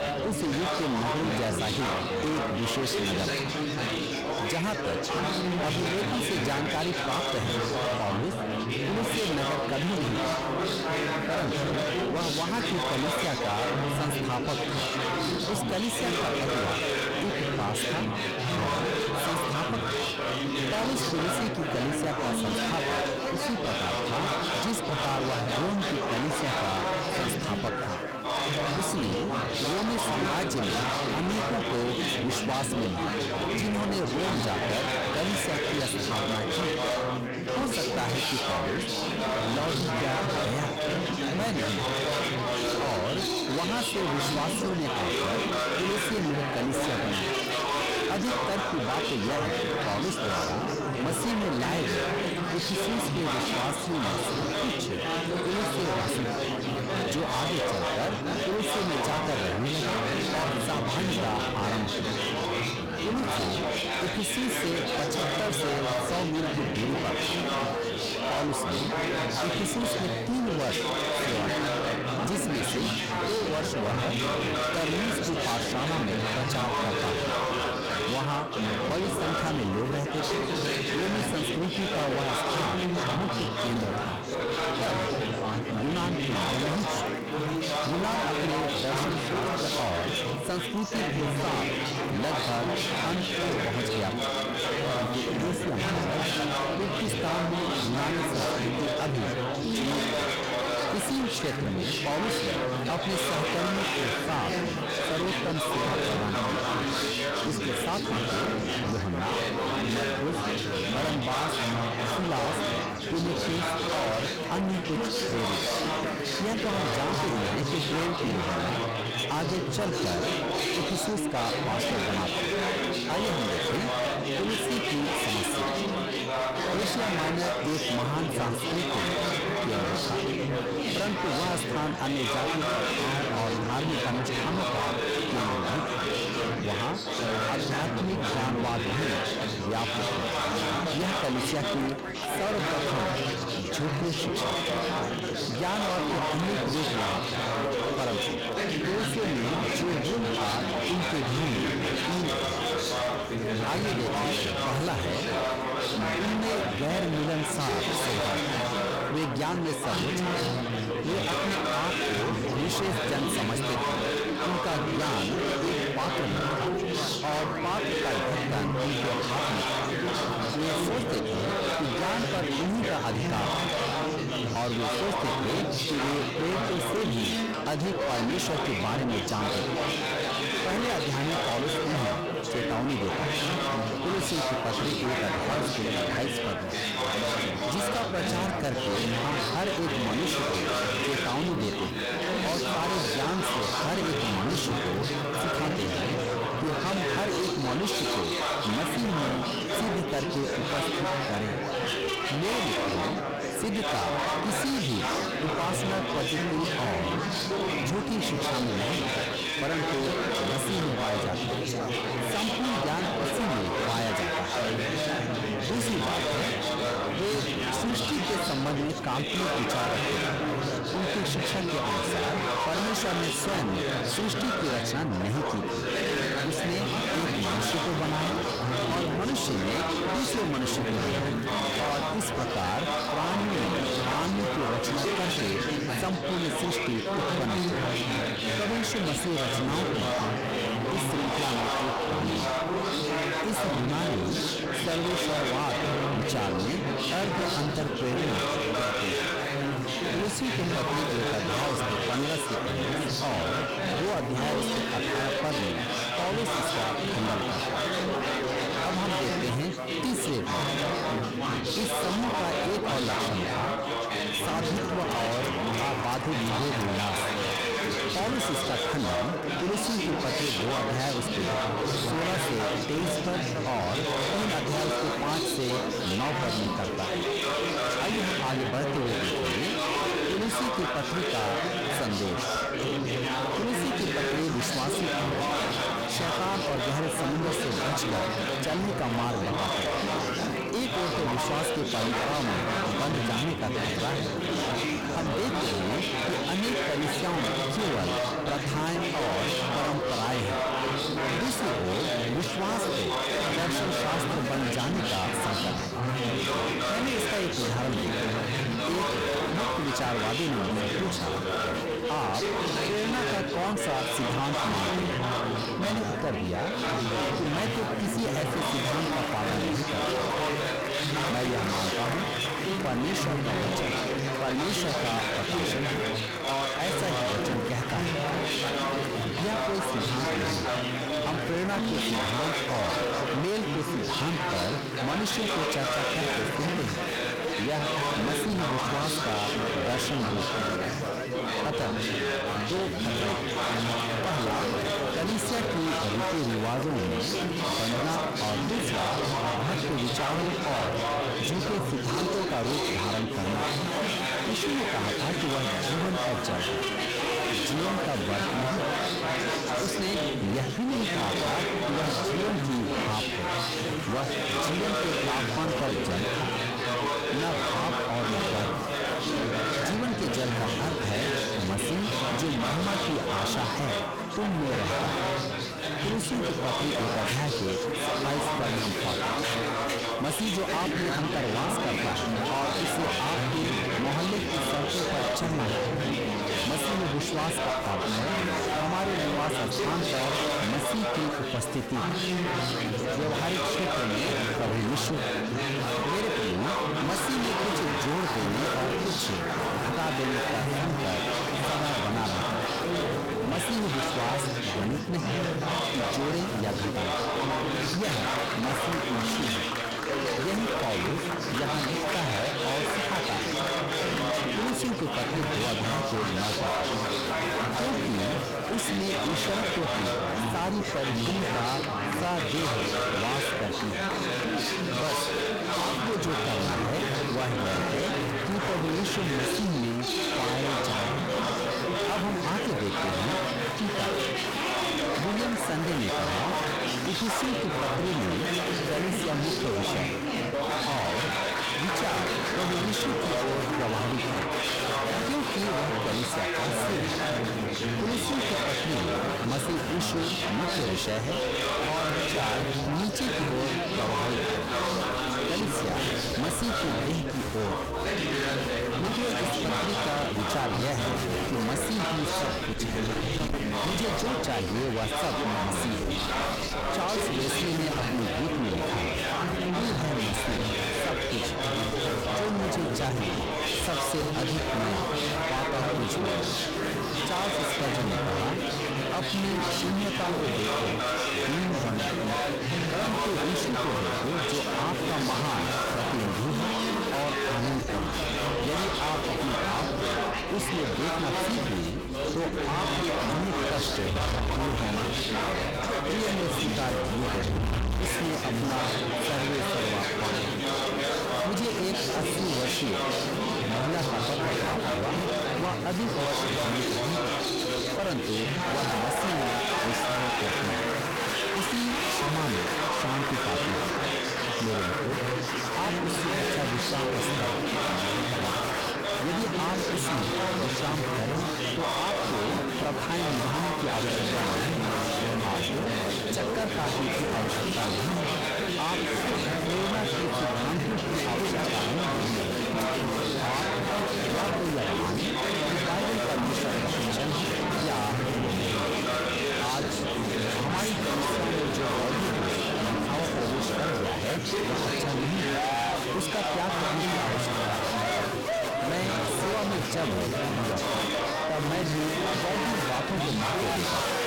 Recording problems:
distortion; heavy; 44% of the sound clipped
echo of what is said; strong; throughout; 470 ms later, 10 dB below the speech
chatter from many people; very loud; throughout; 2 dB above the speech

